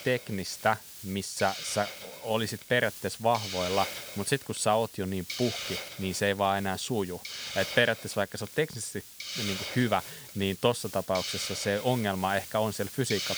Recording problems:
hiss; loud; throughout; 8 dB below the speech

